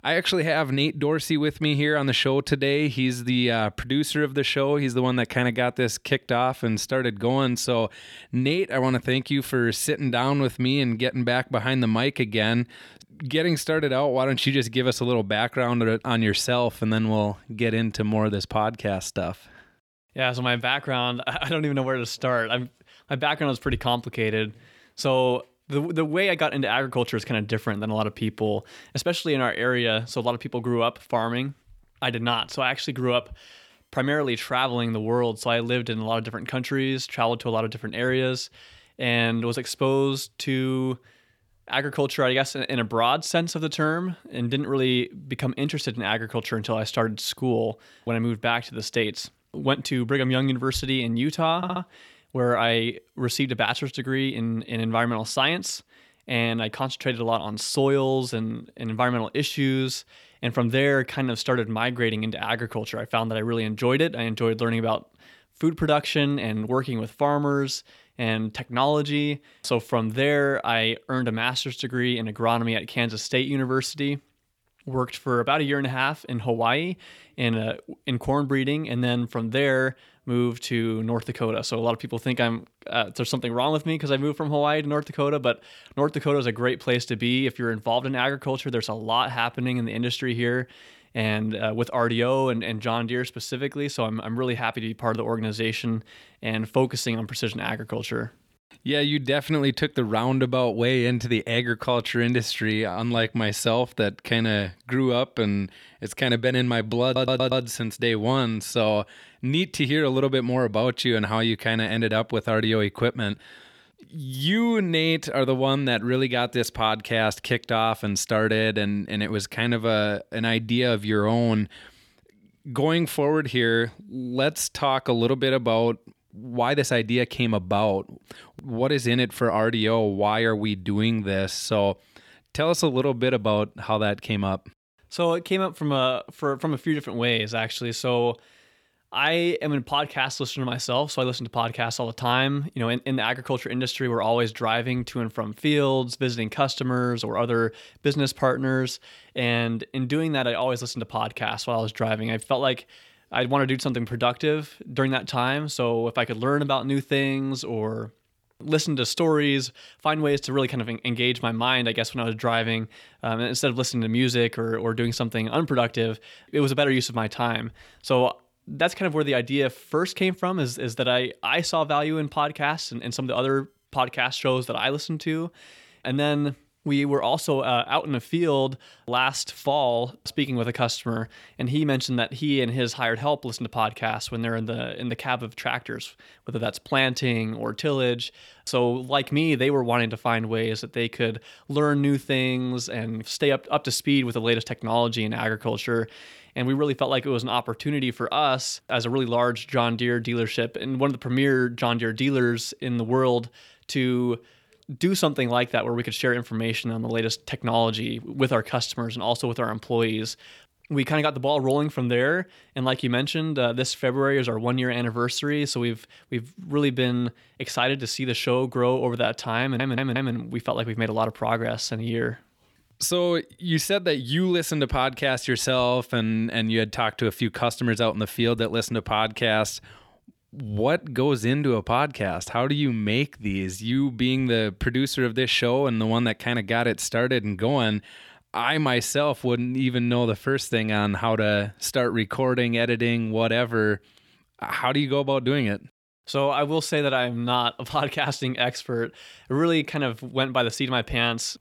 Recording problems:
audio stuttering; at 52 s, at 1:47 and at 3:40

